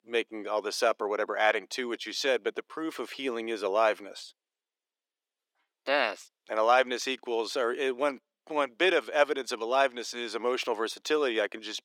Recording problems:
thin; very; fading below 350 Hz

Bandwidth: 18 kHz